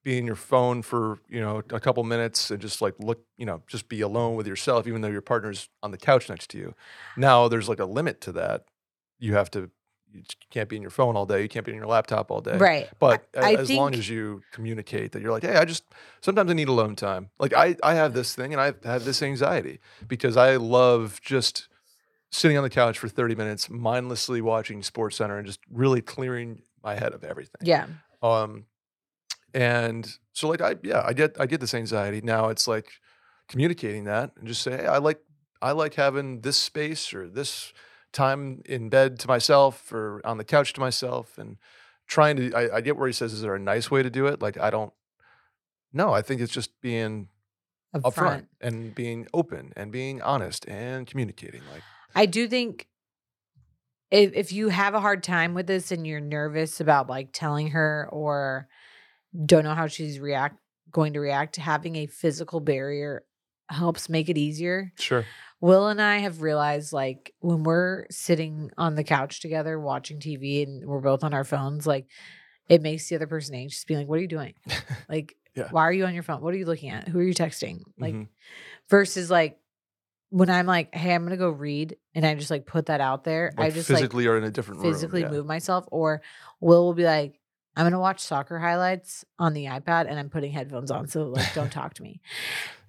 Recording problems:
none

